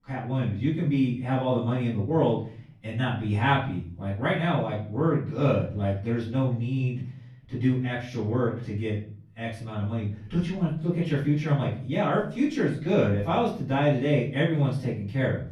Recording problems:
off-mic speech; far
room echo; noticeable; dies away in 0.5 s

